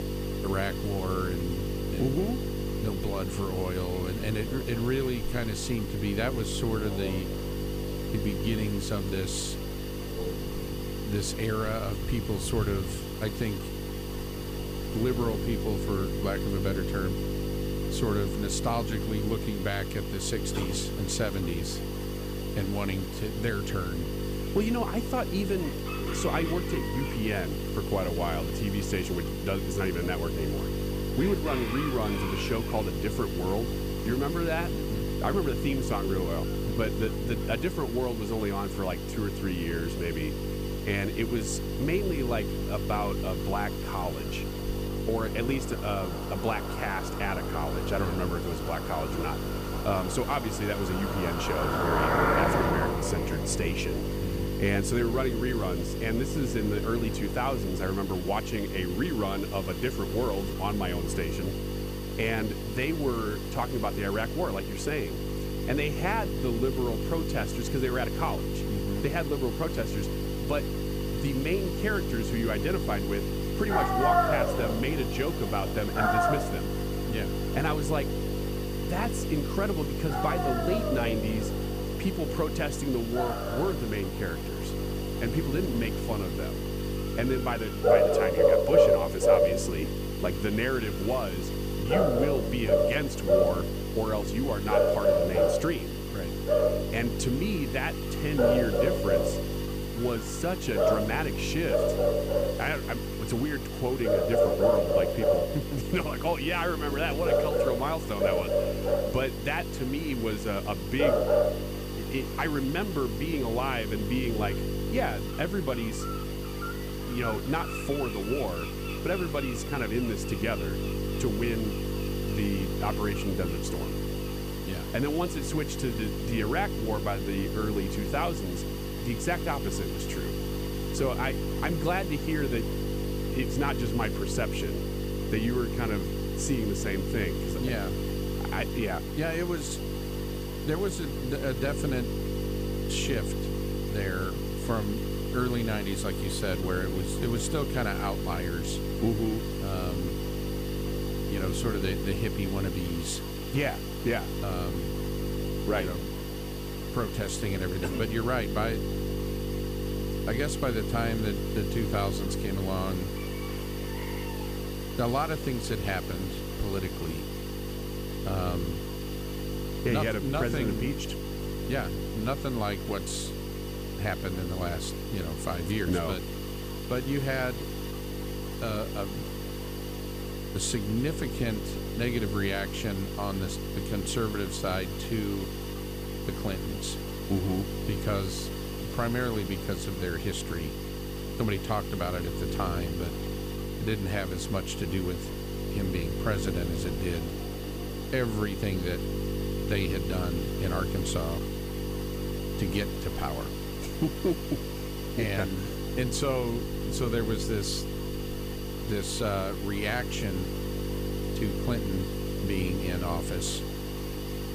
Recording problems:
animal sounds; very loud; throughout; 3 dB above the speech
electrical hum; loud; throughout; 50 Hz, 6 dB below the speech
hiss; loud; throughout; 10 dB below the speech
household noises; faint; throughout; 30 dB below the speech

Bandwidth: 15 kHz